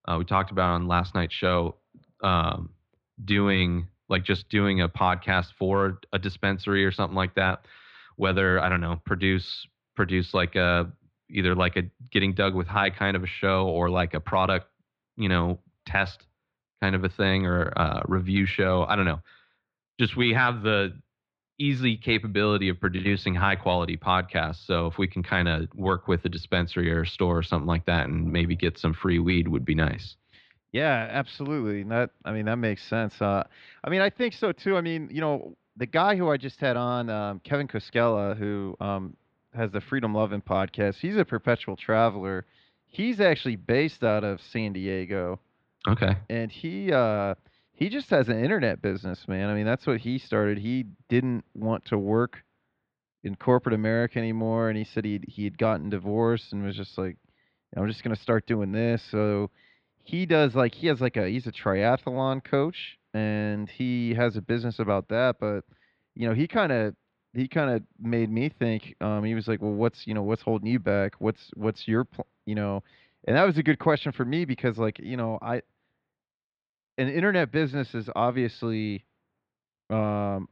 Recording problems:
muffled; slightly; fading above 4 kHz

